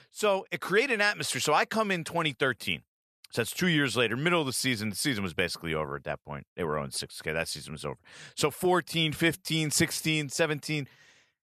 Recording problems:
none

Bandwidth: 13.5 kHz